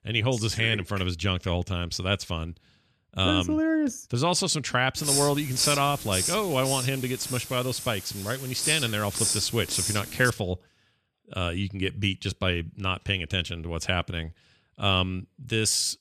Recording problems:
hiss; loud; from 5 to 10 s; 2 dB below the speech

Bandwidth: 14 kHz